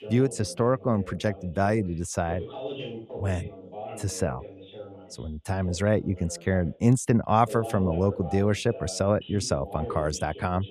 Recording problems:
voice in the background; noticeable; throughout; 15 dB below the speech

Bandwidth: 14 kHz